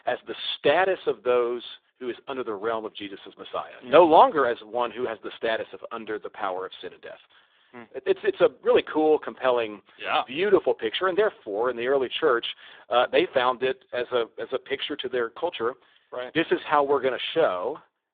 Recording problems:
phone-call audio; poor line

